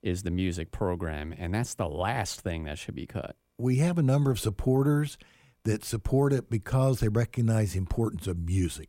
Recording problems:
none

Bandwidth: 16 kHz